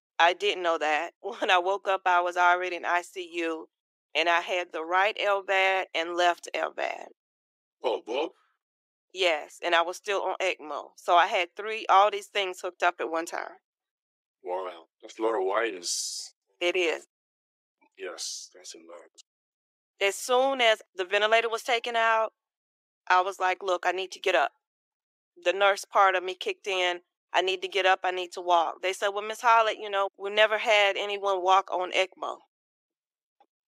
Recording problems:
thin; very; fading below 350 Hz

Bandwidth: 15.5 kHz